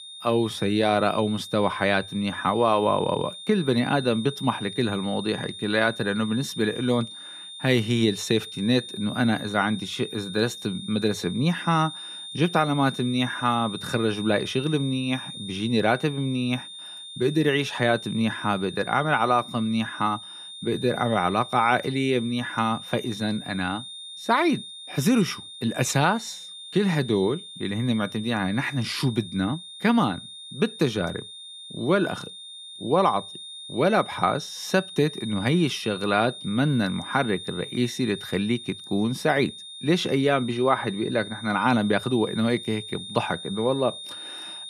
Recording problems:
high-pitched whine; noticeable; throughout; 3.5 kHz, 10 dB below the speech

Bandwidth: 14.5 kHz